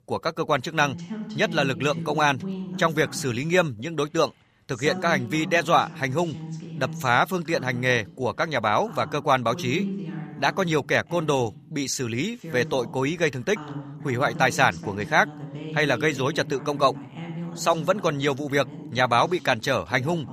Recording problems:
voice in the background; noticeable; throughout; 10 dB below the speech

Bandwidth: 15 kHz